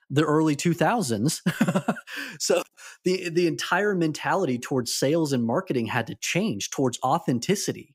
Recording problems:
none

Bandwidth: 15.5 kHz